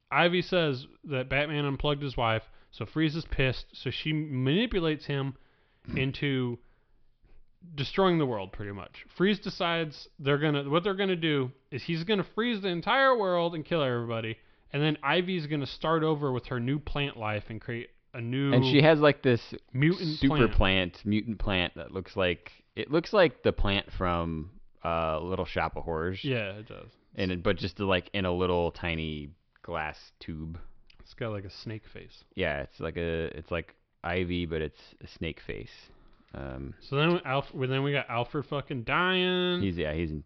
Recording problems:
high frequencies cut off; noticeable; nothing above 5.5 kHz

